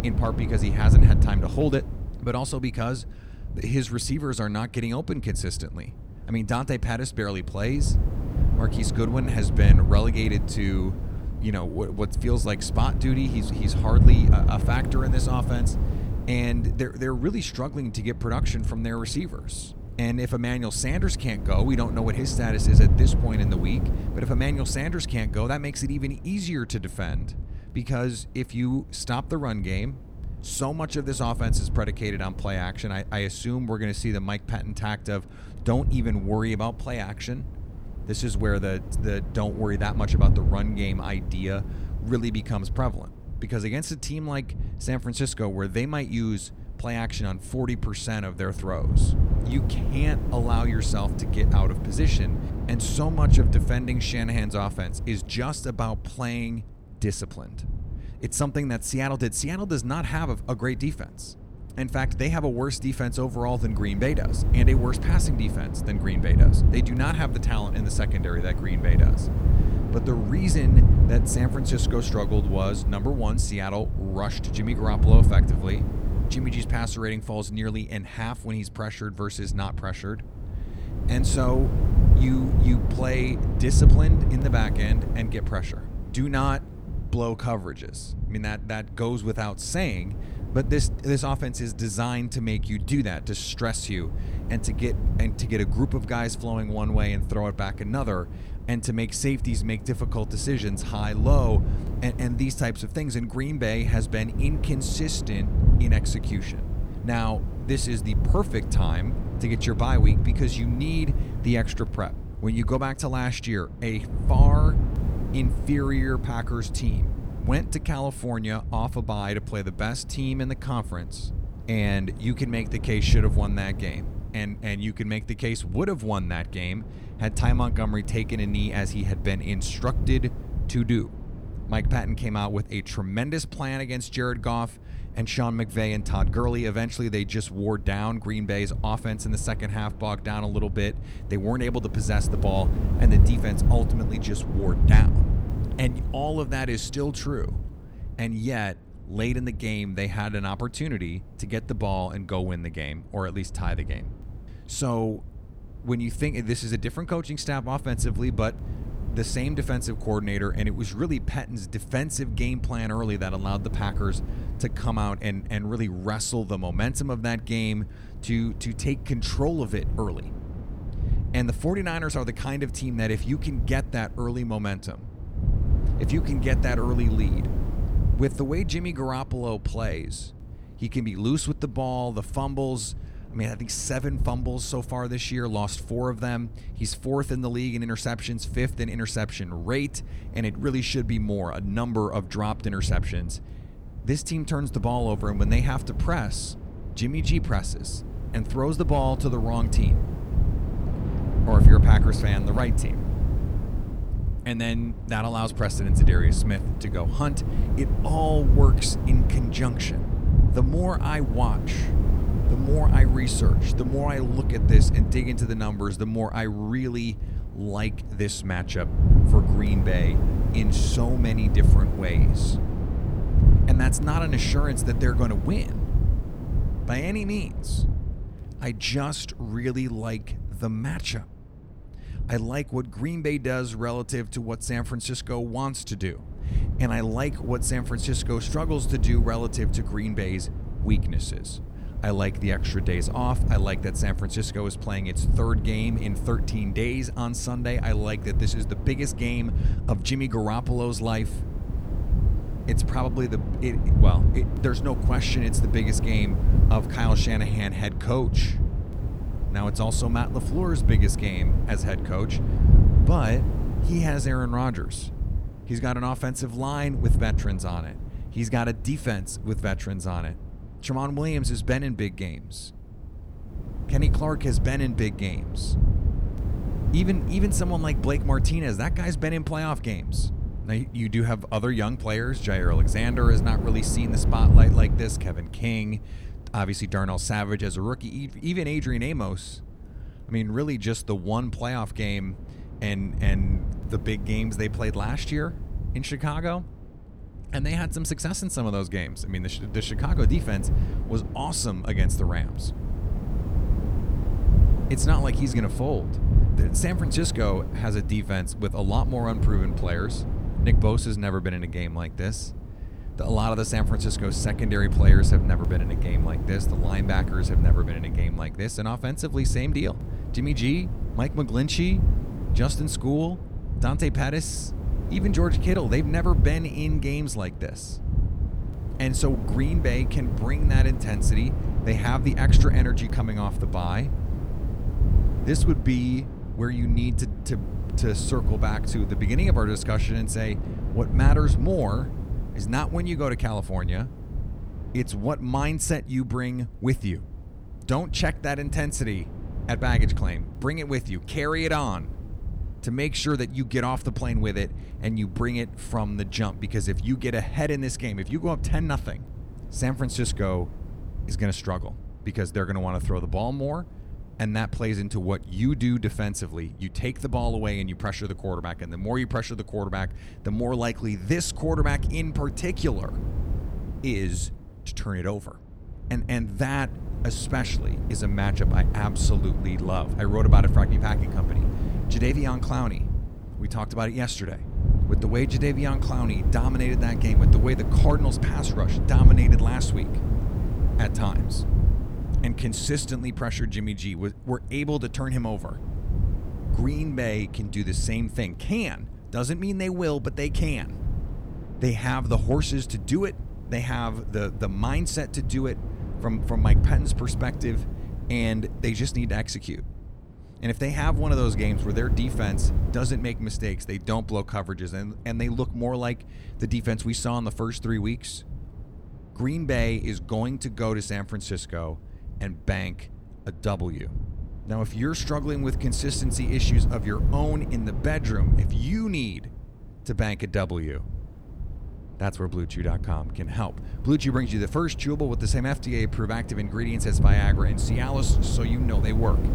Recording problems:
wind noise on the microphone; heavy; 8 dB below the speech

